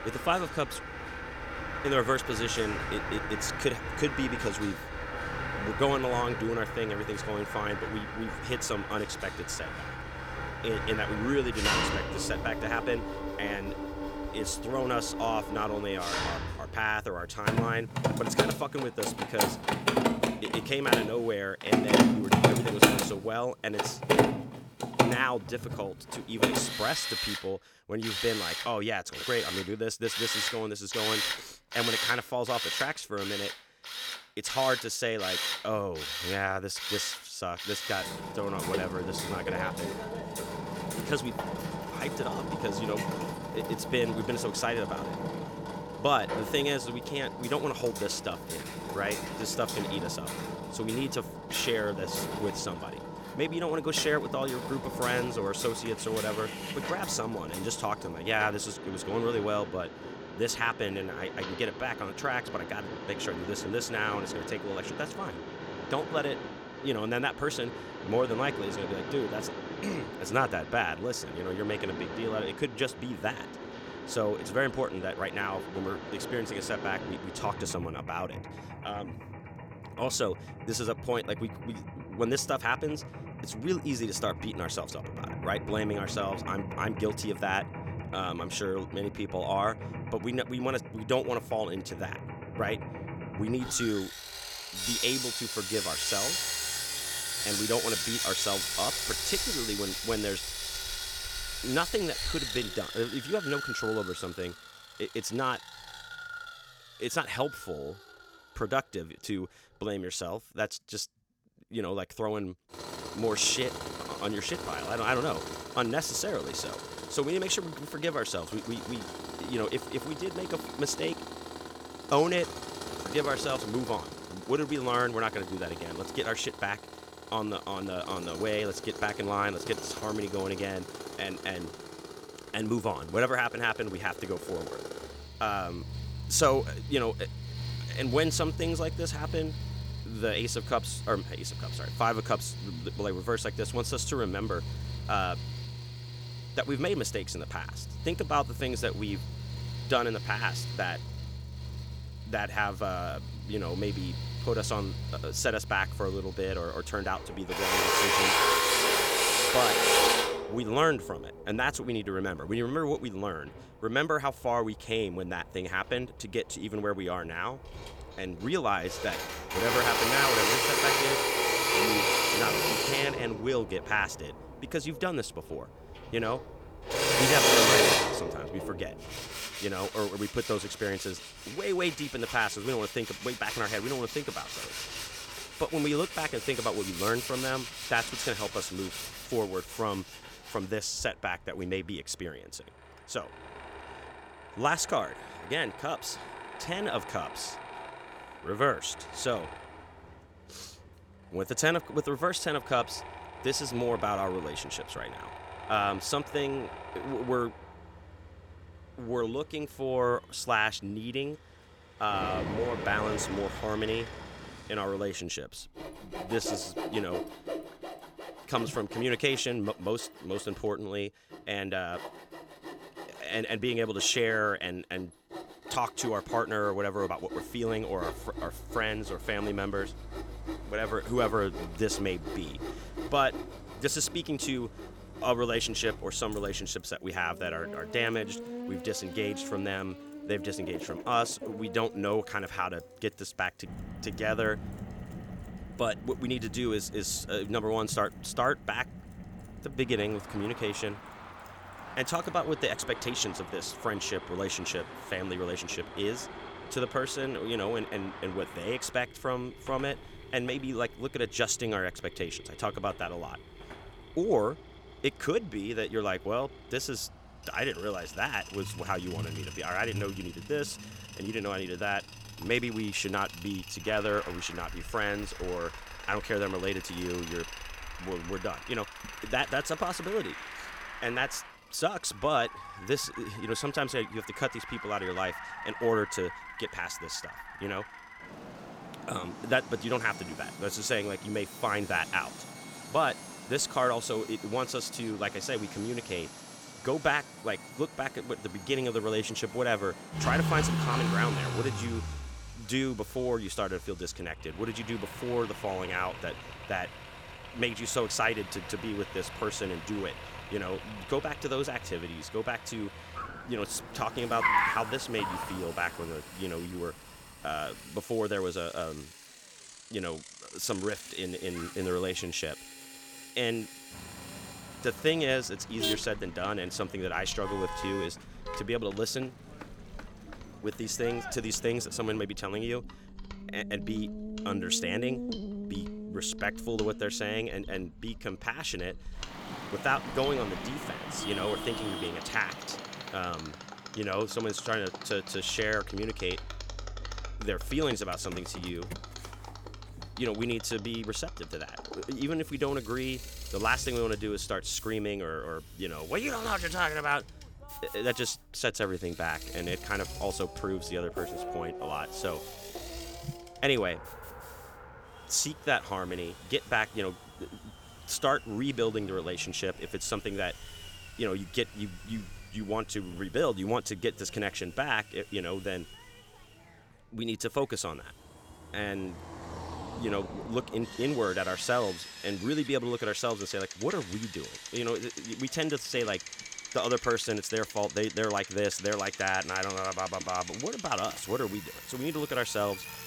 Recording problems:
machinery noise; loud; throughout; 2 dB below the speech
traffic noise; loud; from 3:48 on; 9 dB below the speech

